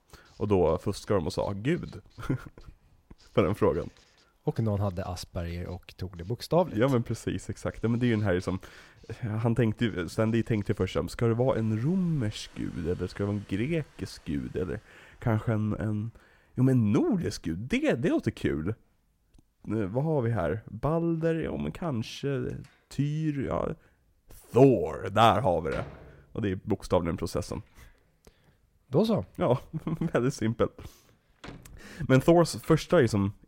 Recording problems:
household noises; faint; throughout; 25 dB below the speech

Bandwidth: 16 kHz